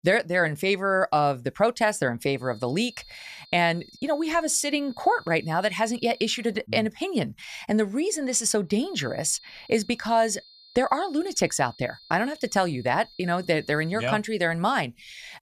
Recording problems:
high-pitched whine; faint; from 2.5 to 6.5 s and from 9 to 14 s; 4 kHz, 25 dB below the speech

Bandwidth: 14.5 kHz